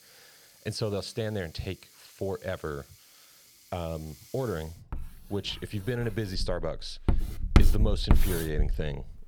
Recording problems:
household noises; very loud; throughout; 4 dB above the speech

